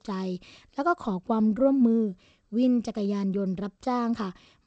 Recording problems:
garbled, watery; slightly; nothing above 8 kHz

